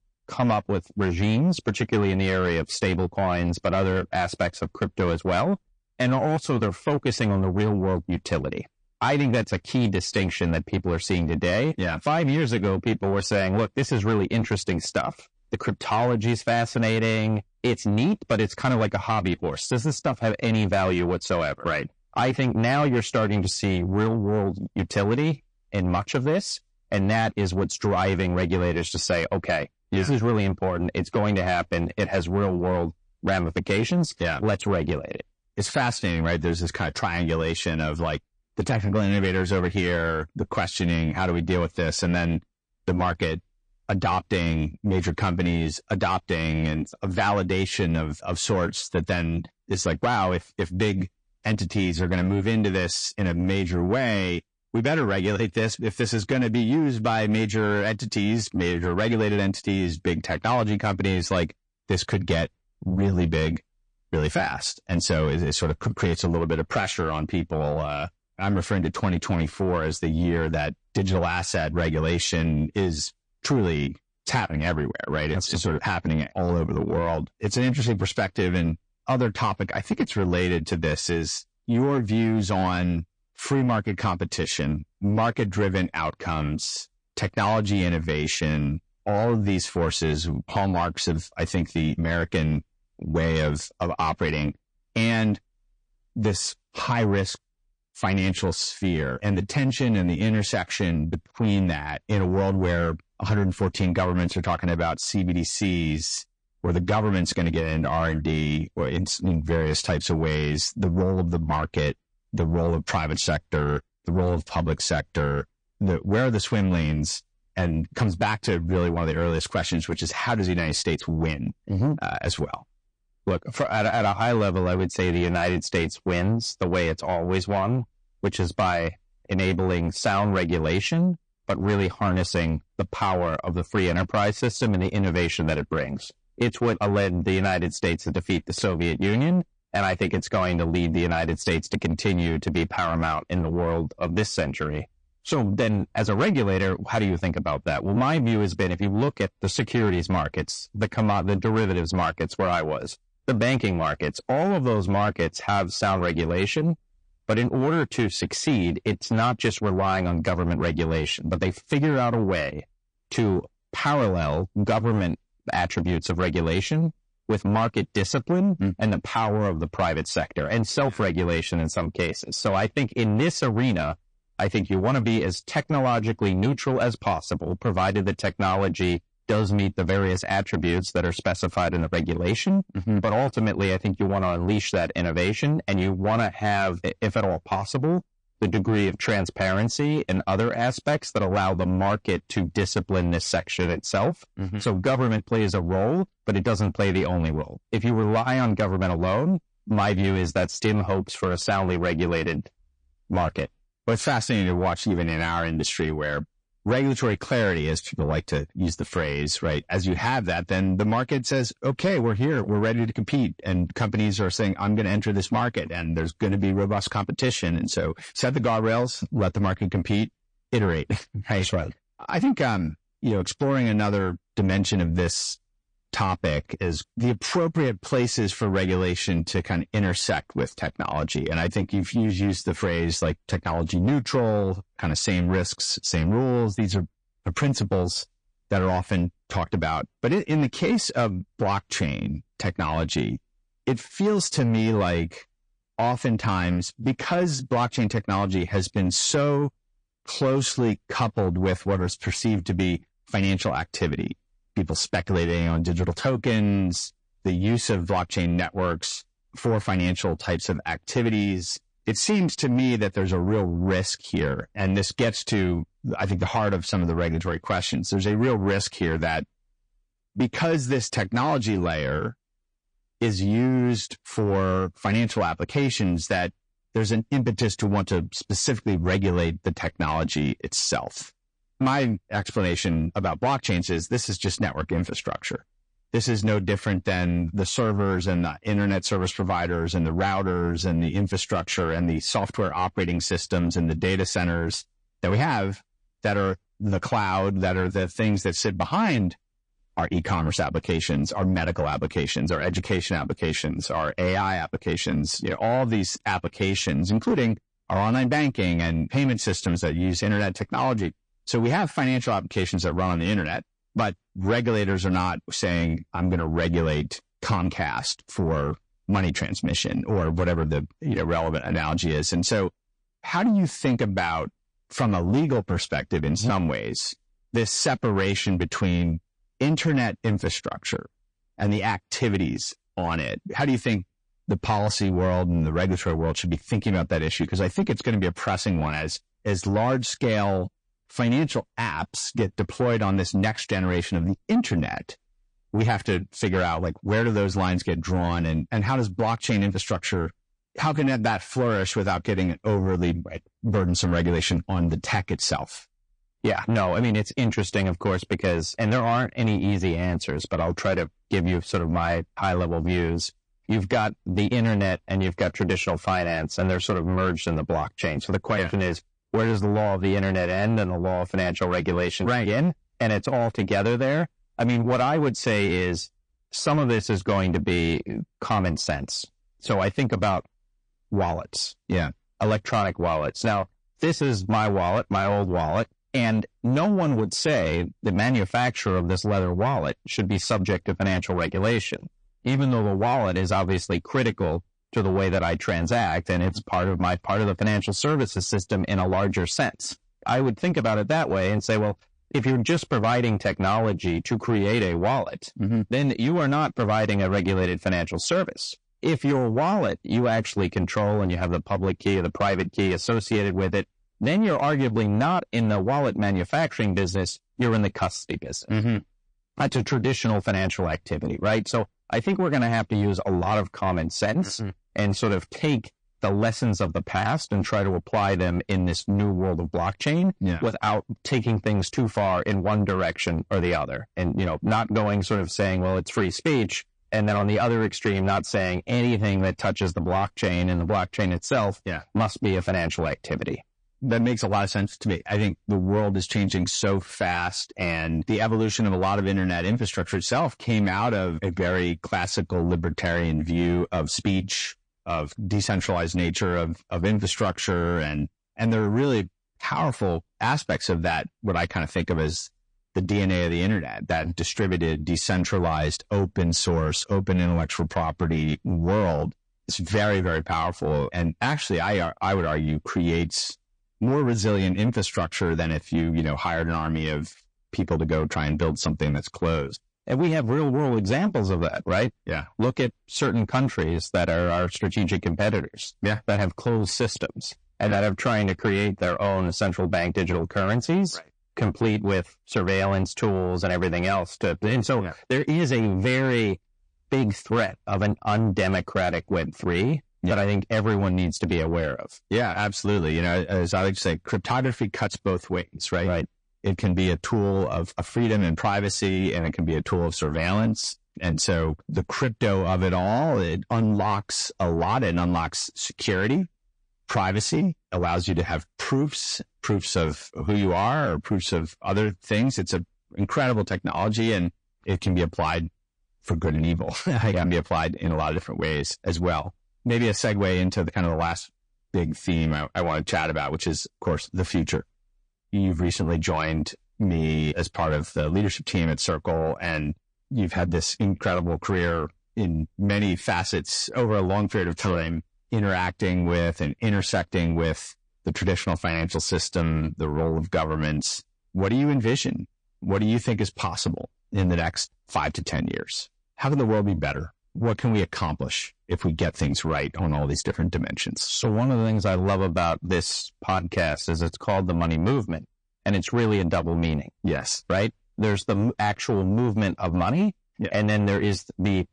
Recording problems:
distortion; slight; 10 dB below the speech
garbled, watery; slightly; nothing above 8.5 kHz

